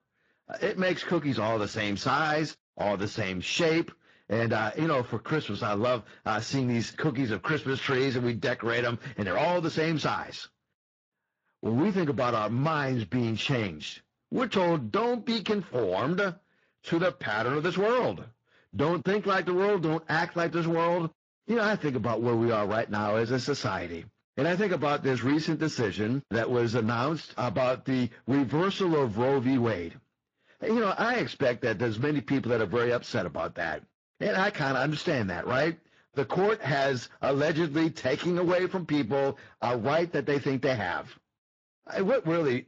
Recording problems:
distortion; slight; 9% of the sound clipped
garbled, watery; slightly

